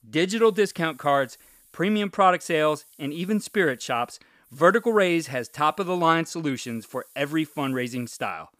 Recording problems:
hiss; faint; throughout; 30 dB below the speech

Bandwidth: 15 kHz